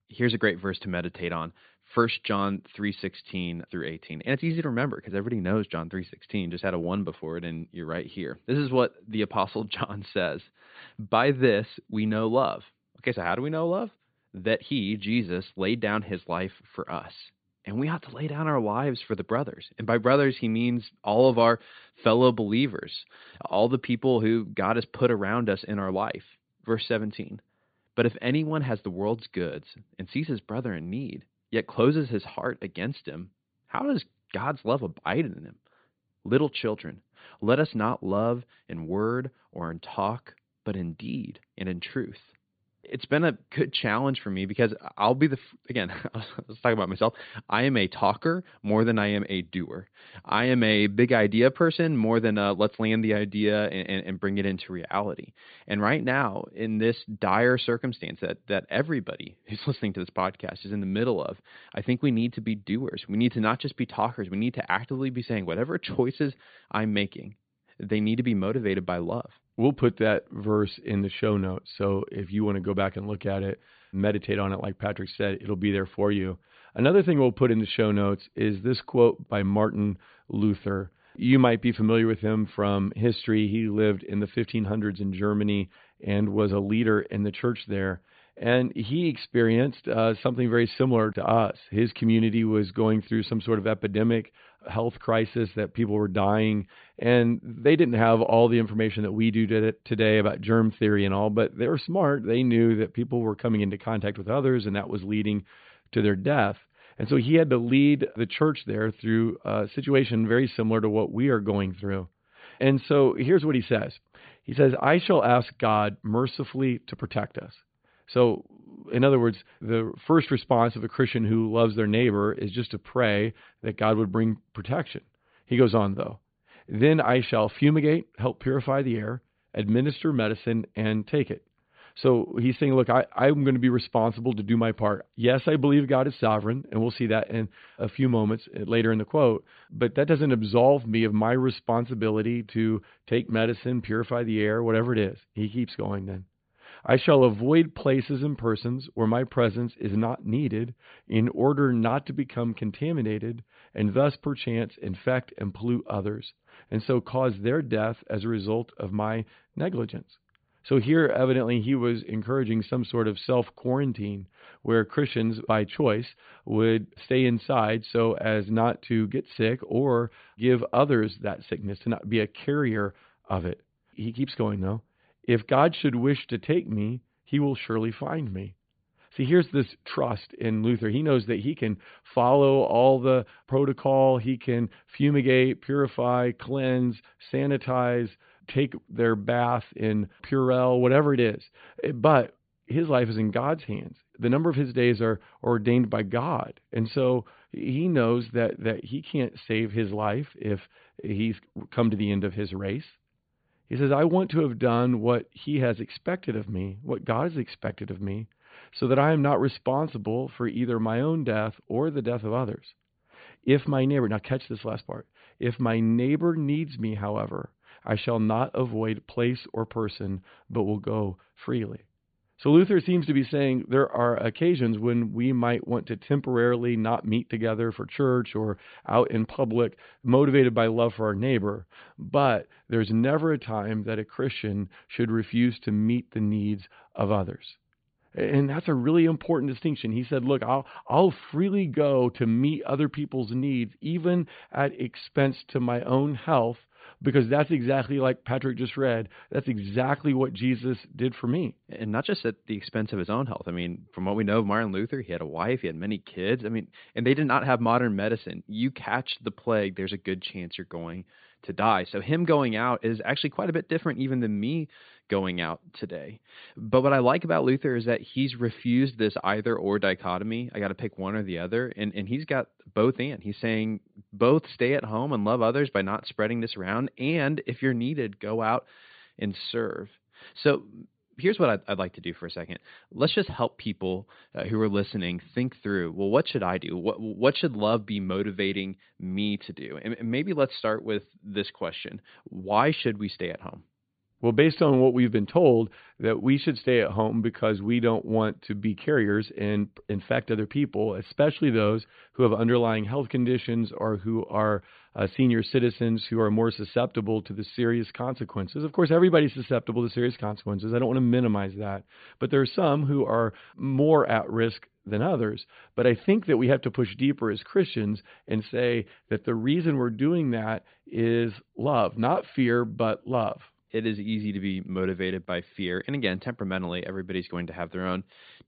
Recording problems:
high frequencies cut off; severe; nothing above 4.5 kHz

